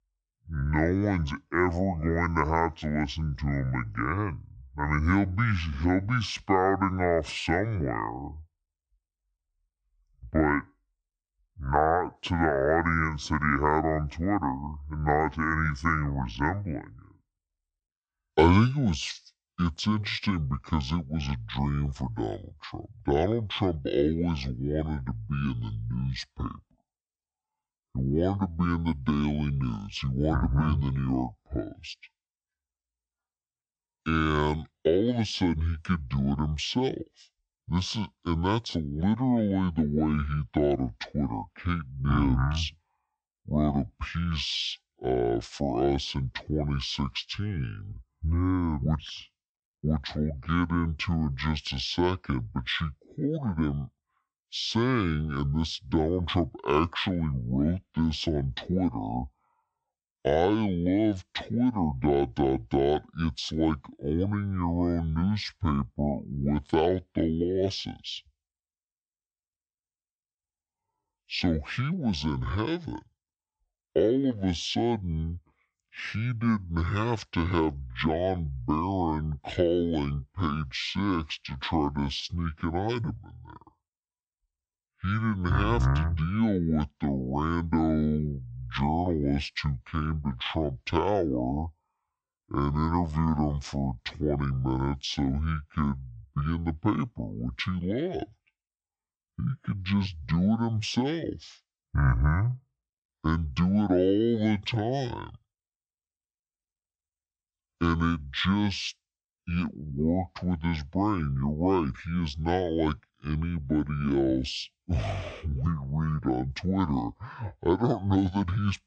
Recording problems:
wrong speed and pitch; too slow and too low; 0.6 times normal speed

